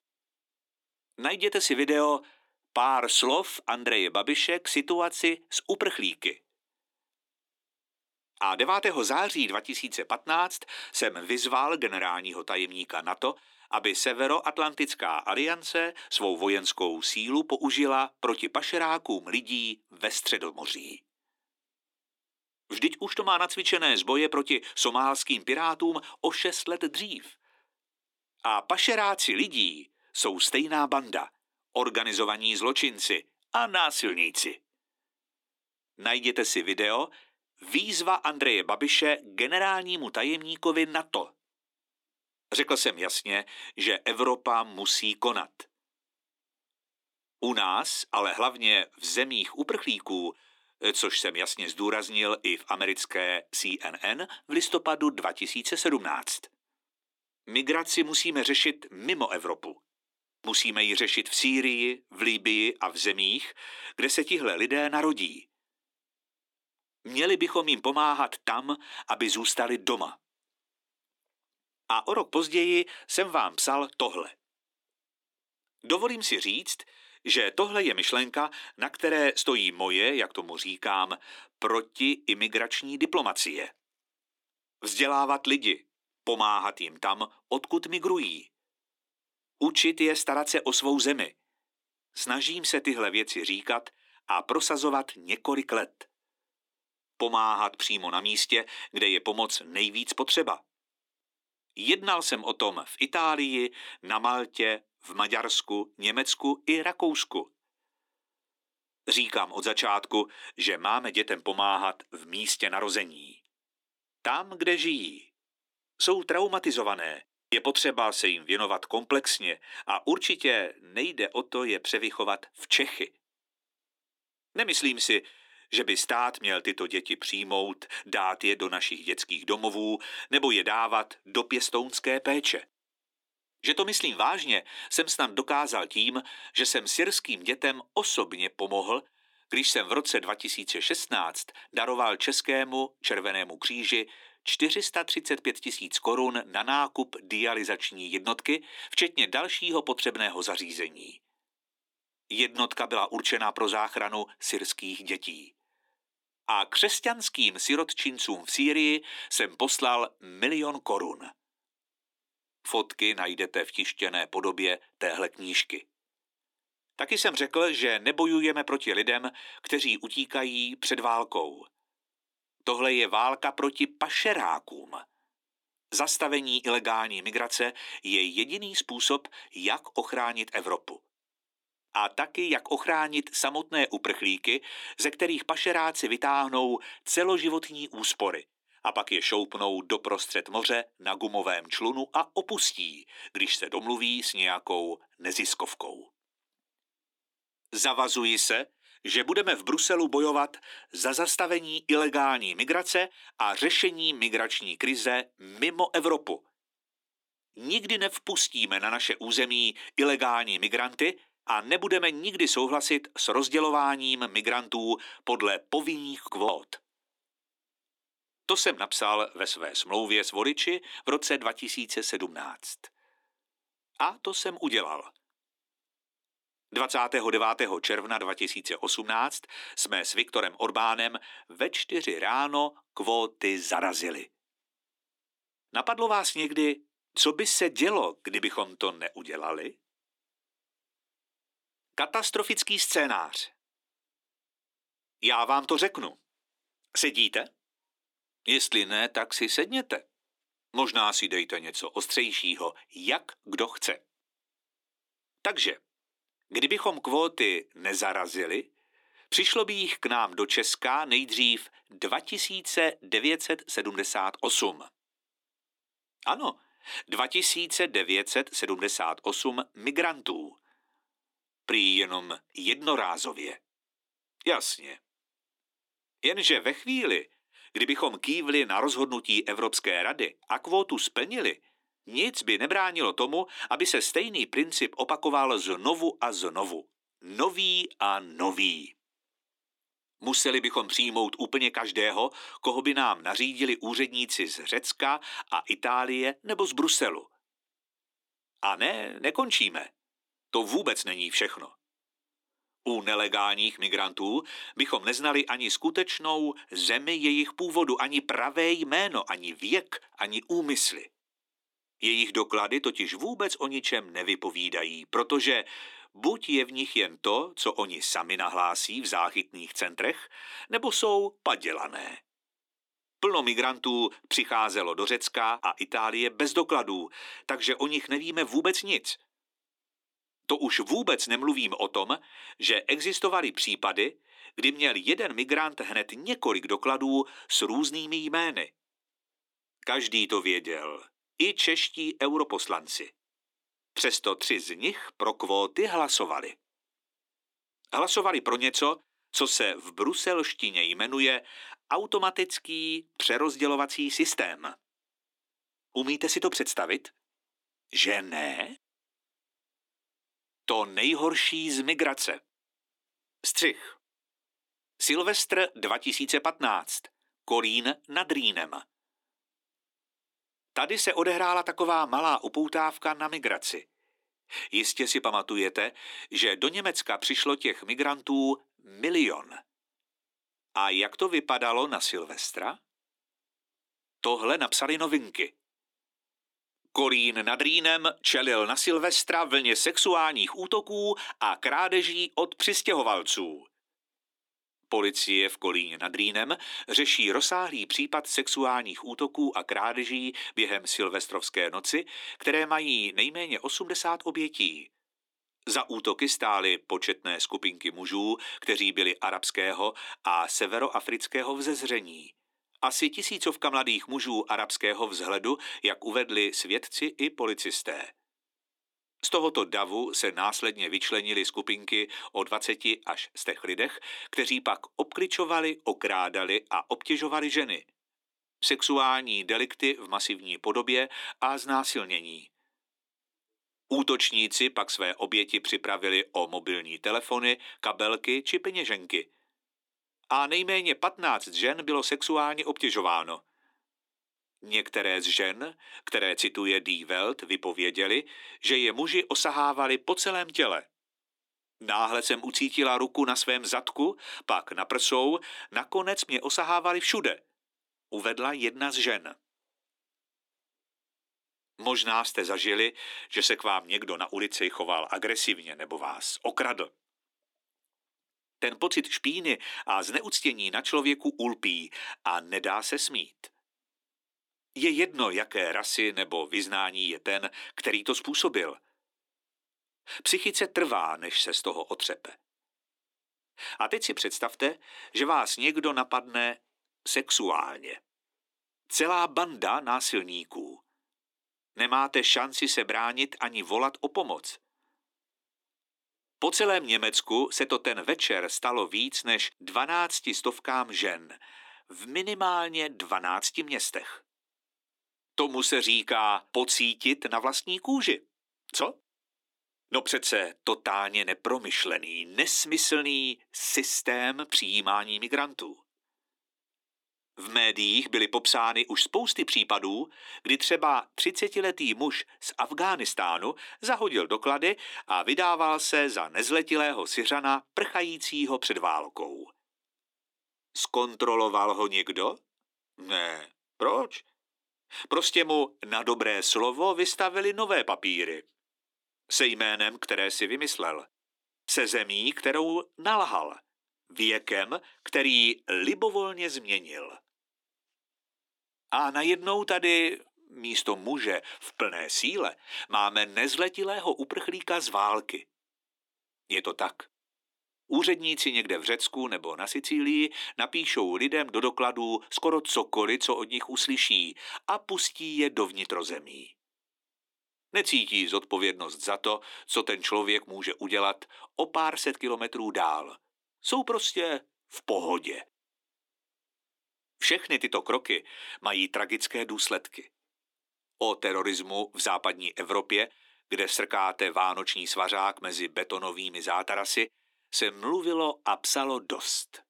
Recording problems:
thin; somewhat; fading below 300 Hz

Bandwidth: 18 kHz